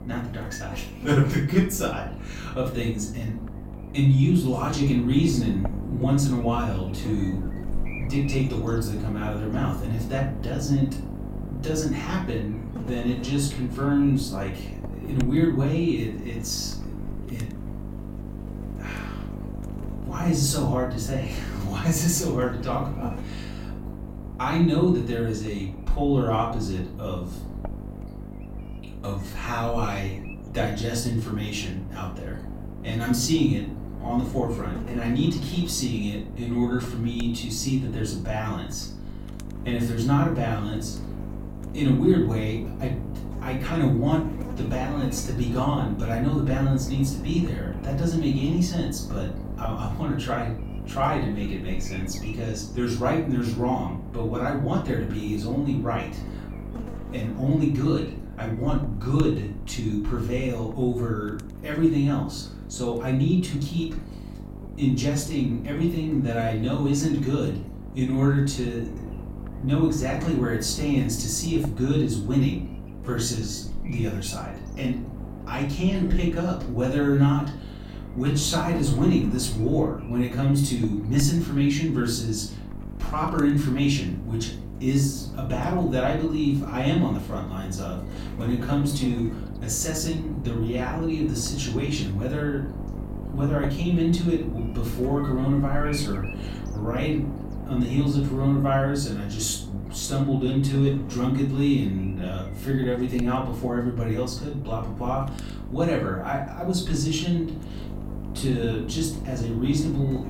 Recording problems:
off-mic speech; far
room echo; slight; dies away in 0.4 s
electrical hum; noticeable; throughout; 50 Hz, 15 dB below the speech

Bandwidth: 16 kHz